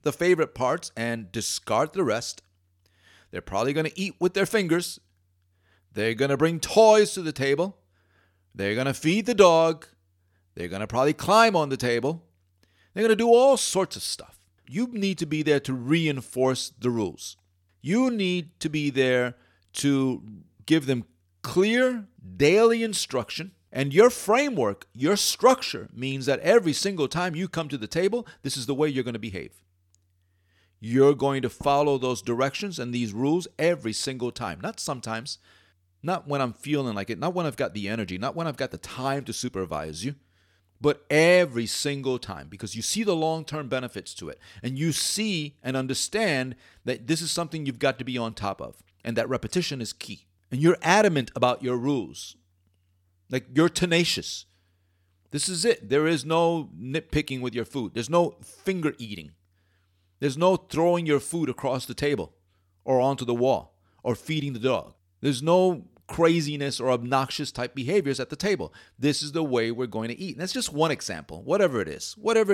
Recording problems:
abrupt cut into speech; at the end

